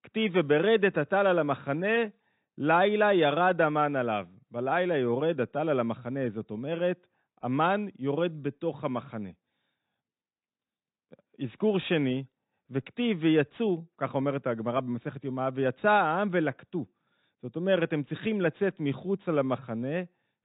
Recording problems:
high frequencies cut off; severe; nothing above 4 kHz

